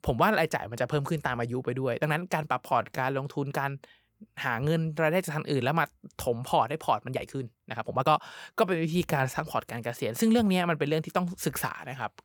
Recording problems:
uneven, jittery; strongly; from 2 to 9.5 s

